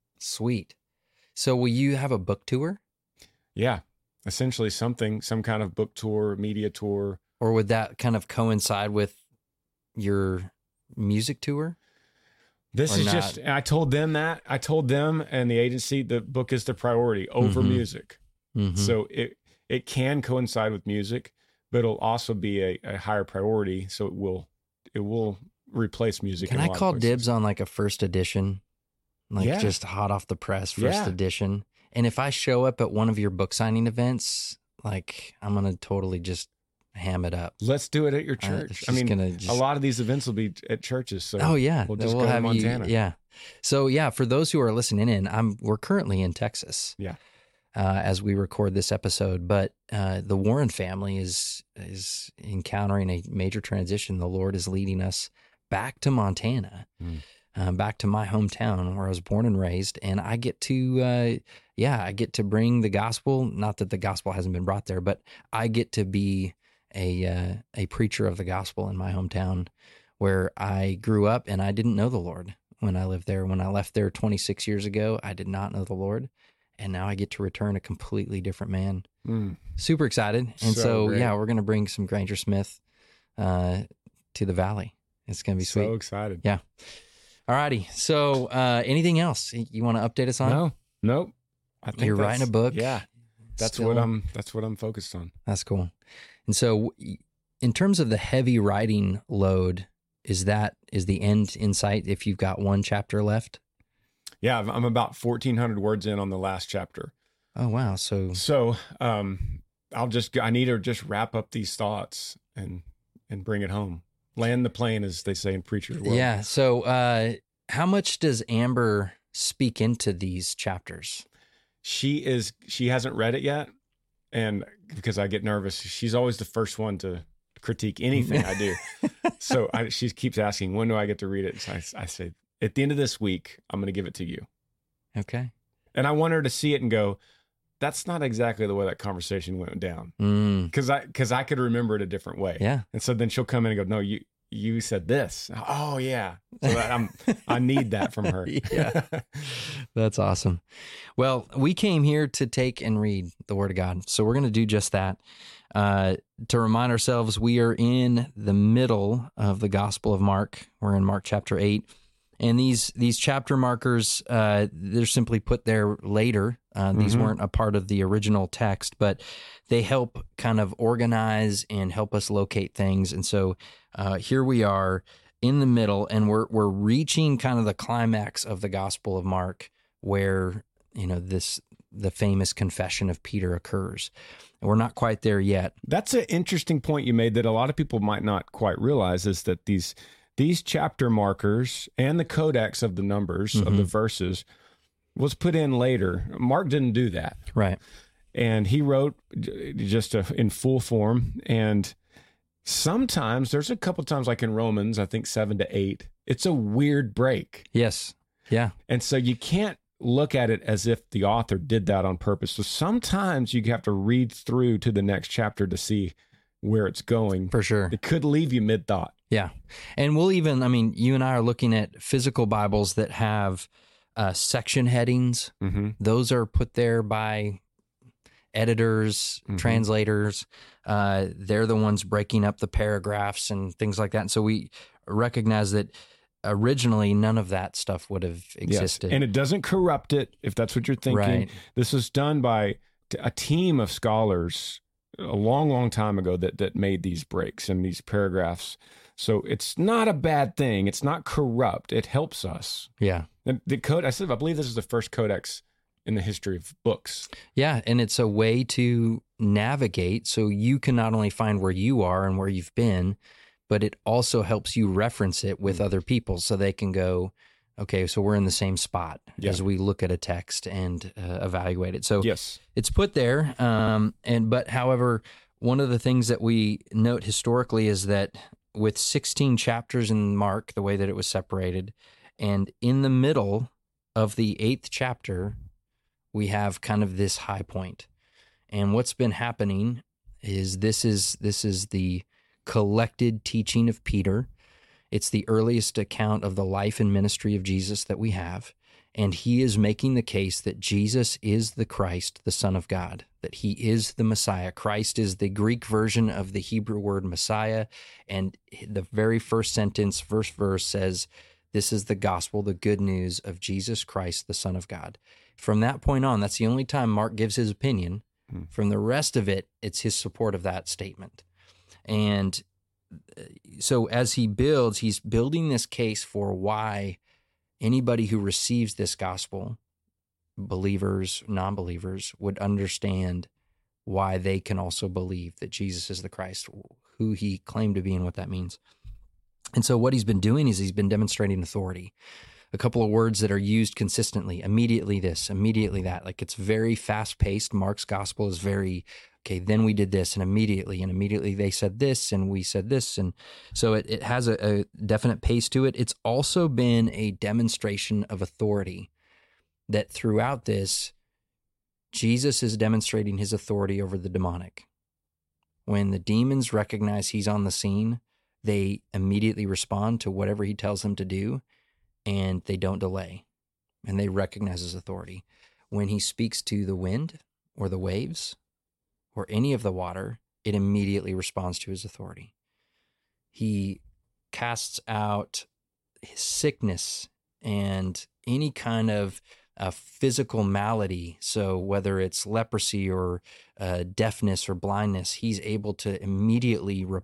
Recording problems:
audio stuttering; at 4:34

